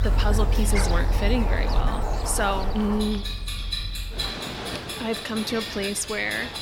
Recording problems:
animal sounds; loud; throughout; 2 dB below the speech
household noises; loud; throughout; 5 dB below the speech

